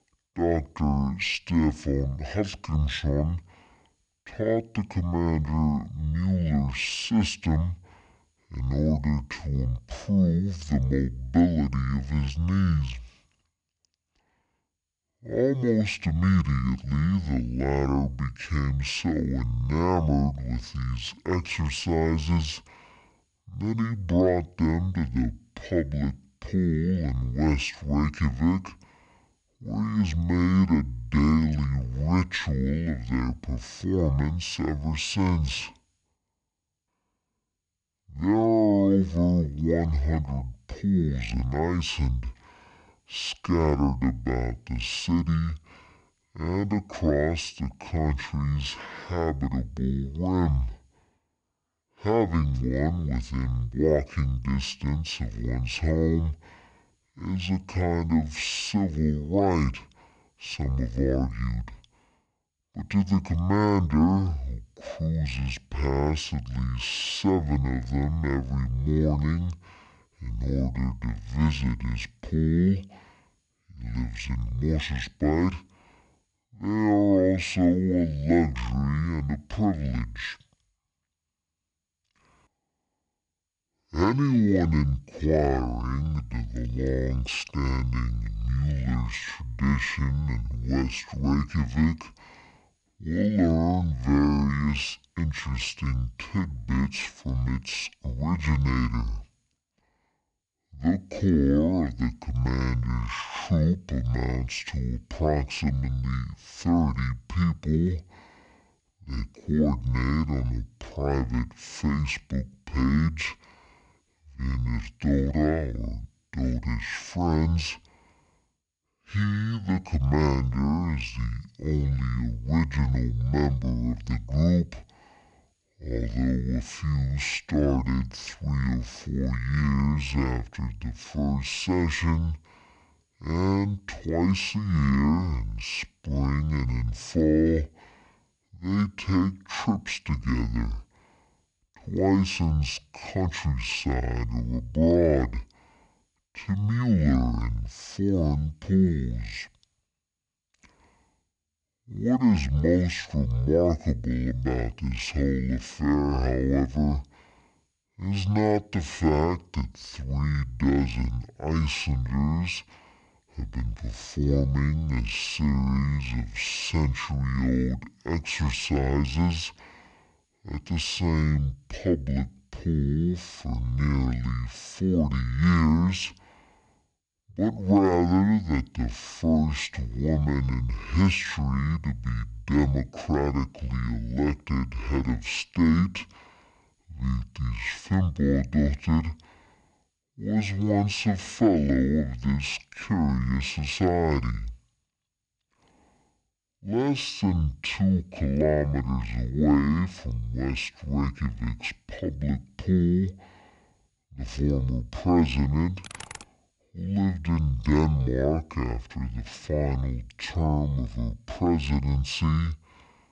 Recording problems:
wrong speed and pitch; too slow and too low; 0.5 times normal speed
keyboard typing; faint; at 3:26; peak 15 dB below the speech

